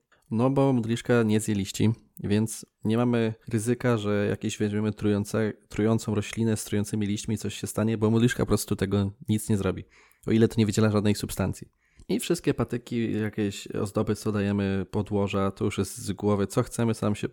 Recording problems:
none

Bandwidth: 17.5 kHz